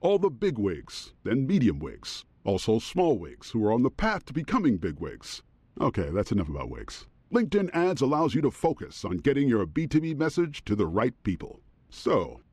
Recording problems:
muffled; slightly; fading above 3.5 kHz

